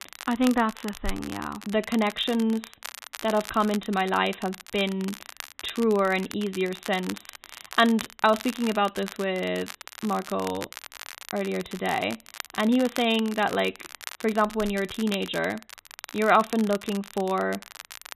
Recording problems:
high frequencies cut off; severe; nothing above 4 kHz
crackle, like an old record; noticeable; 15 dB below the speech

